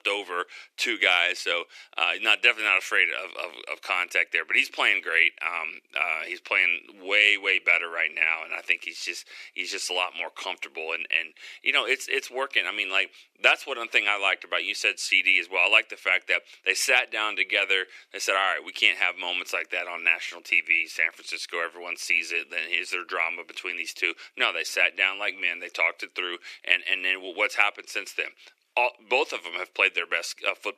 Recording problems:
thin; very; fading below 350 Hz

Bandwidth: 14.5 kHz